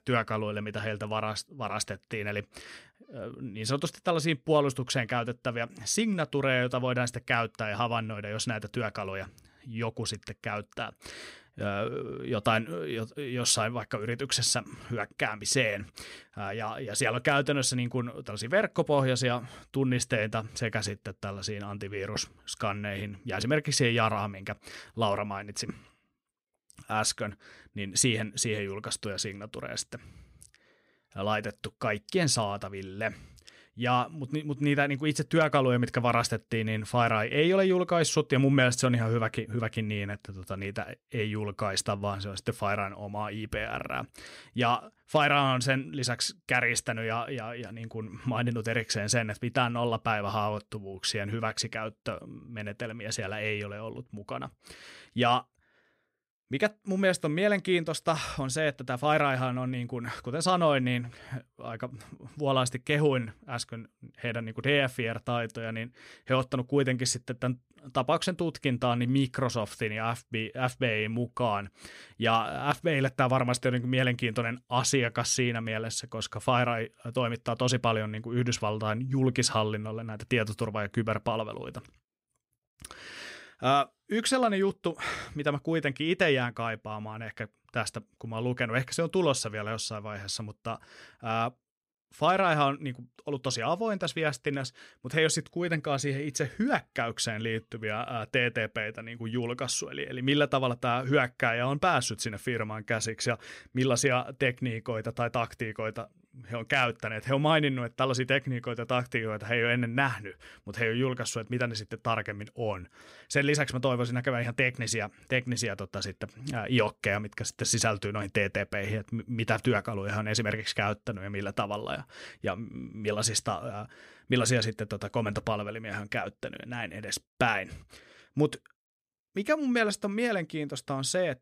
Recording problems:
none

